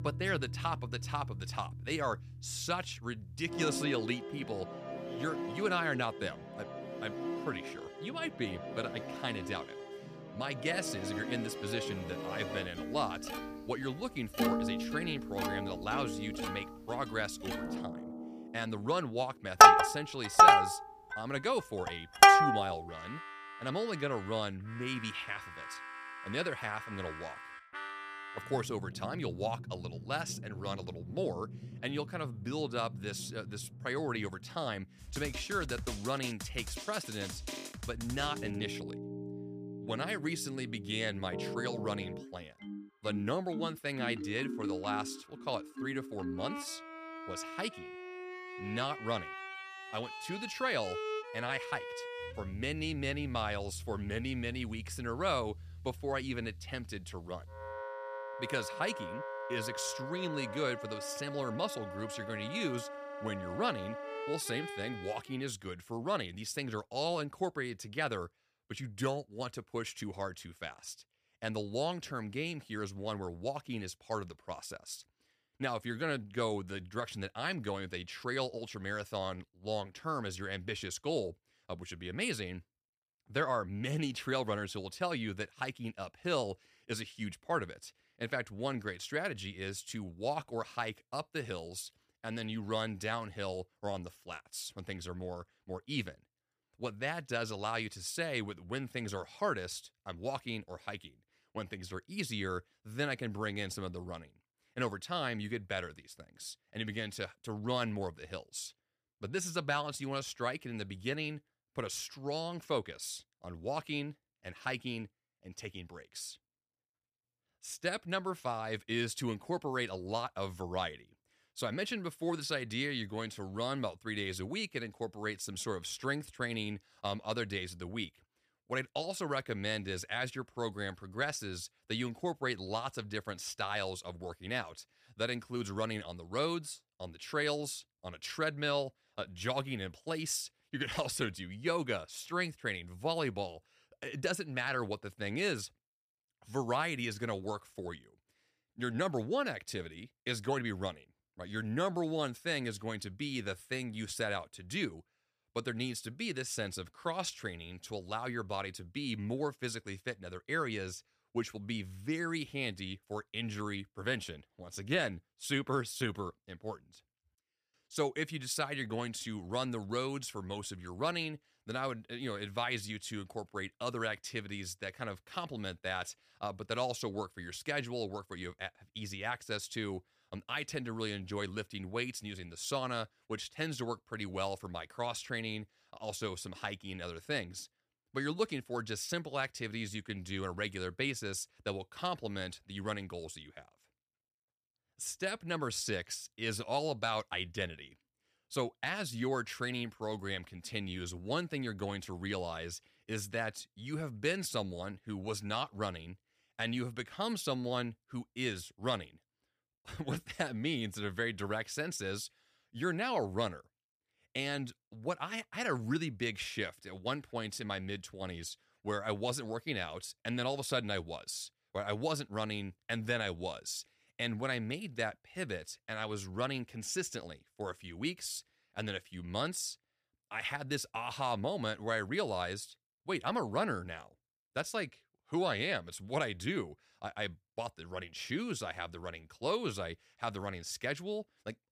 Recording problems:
background music; very loud; until 1:05; 5 dB above the speech

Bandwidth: 15 kHz